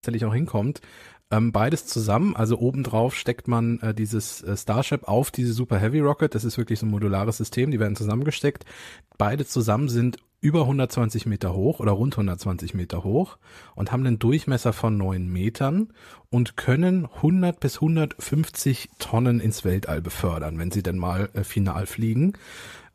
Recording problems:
none

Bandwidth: 14.5 kHz